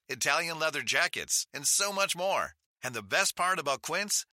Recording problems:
thin; somewhat; fading below 900 Hz

